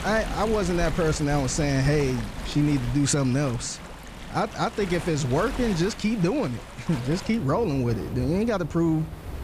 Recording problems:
rain or running water; noticeable; throughout; 10 dB below the speech

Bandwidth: 15 kHz